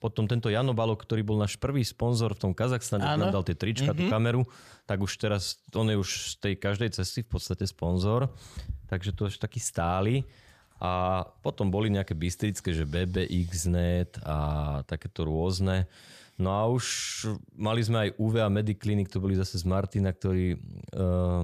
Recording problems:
abrupt cut into speech; at the end

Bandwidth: 14.5 kHz